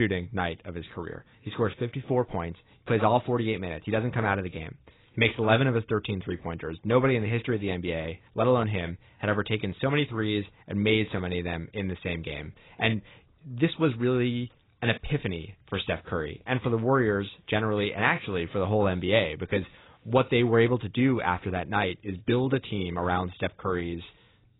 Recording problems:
garbled, watery; badly; nothing above 4 kHz
abrupt cut into speech; at the start

